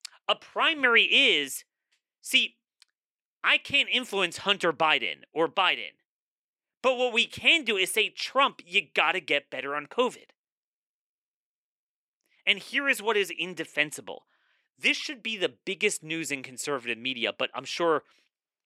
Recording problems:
thin; somewhat; fading below 350 Hz

